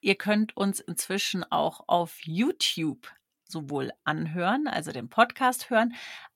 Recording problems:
none

